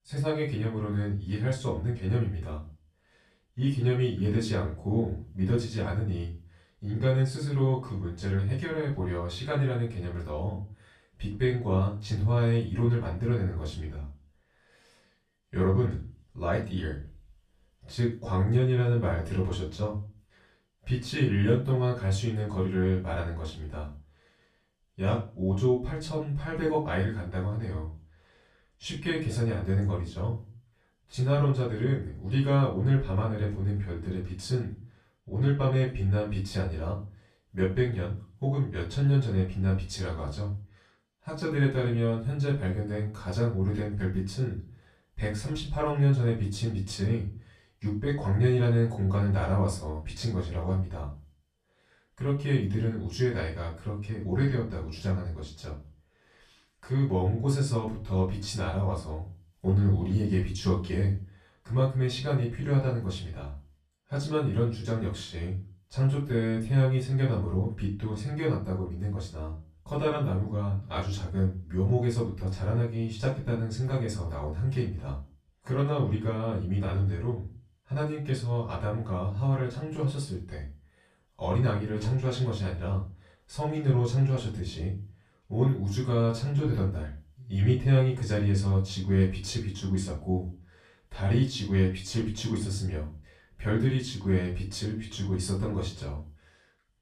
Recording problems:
off-mic speech; far
room echo; slight; dies away in 0.3 s

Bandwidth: 14.5 kHz